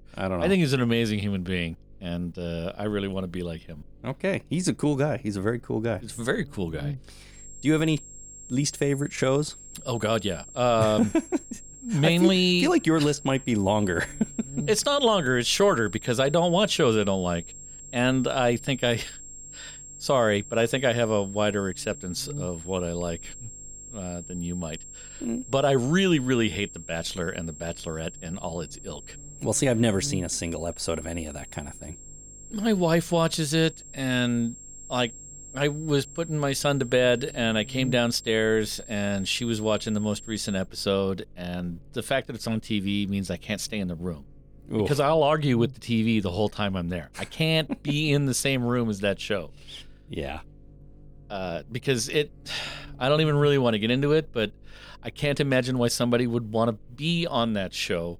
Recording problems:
high-pitched whine; noticeable; from 7.5 to 41 s; 7.5 kHz, 15 dB below the speech
electrical hum; faint; throughout; 50 Hz, 30 dB below the speech

